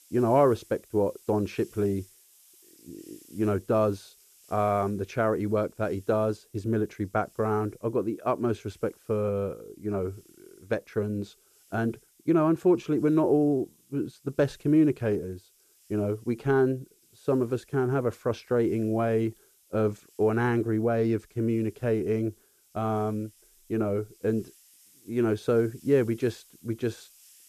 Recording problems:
muffled; slightly; fading above 2 kHz
hiss; faint; throughout; 30 dB below the speech

